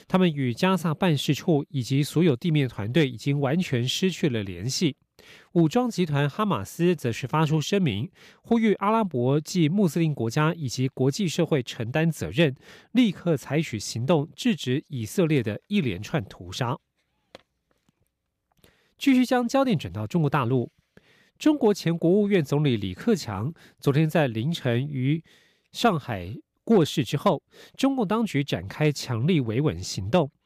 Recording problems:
none

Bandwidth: 15 kHz